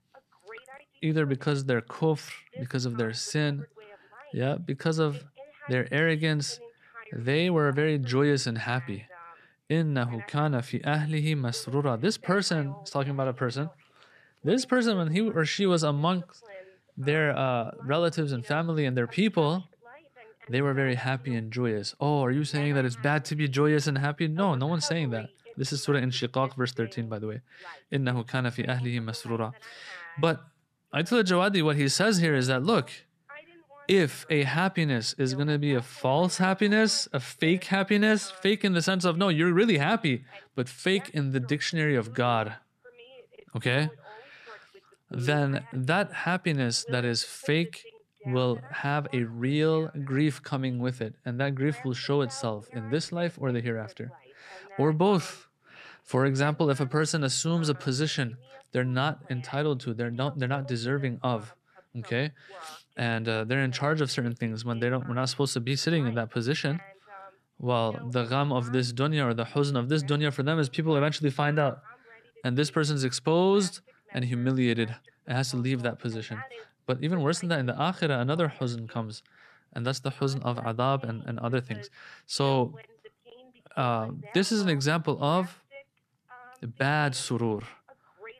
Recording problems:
voice in the background; faint; throughout; 25 dB below the speech

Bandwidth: 13.5 kHz